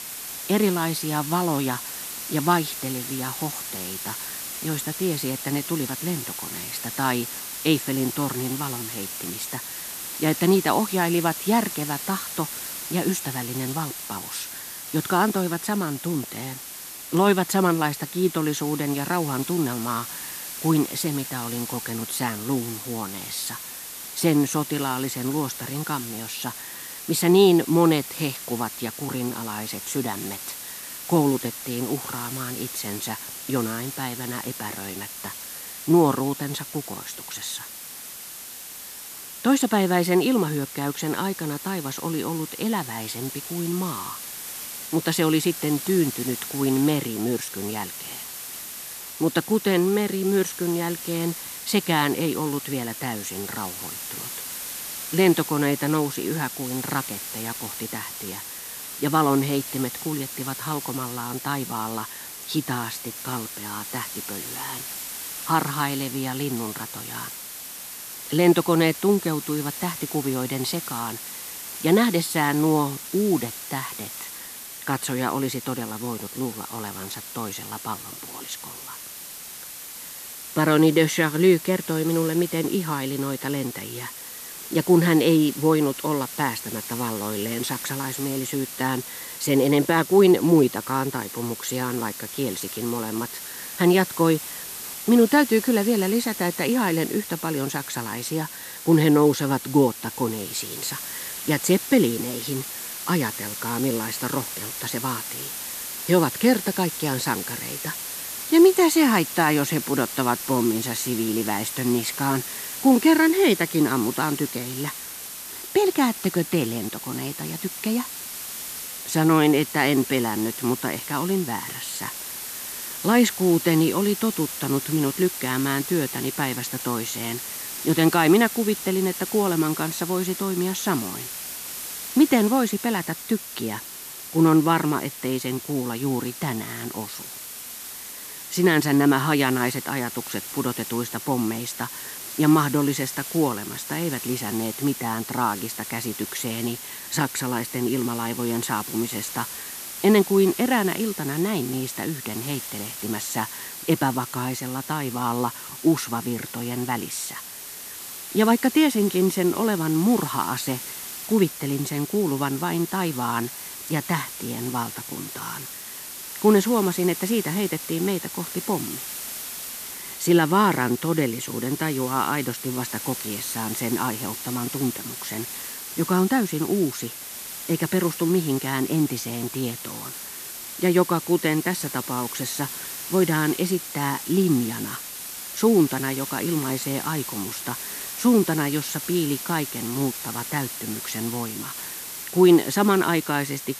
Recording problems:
hiss; loud; throughout; 8 dB below the speech

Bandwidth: 14.5 kHz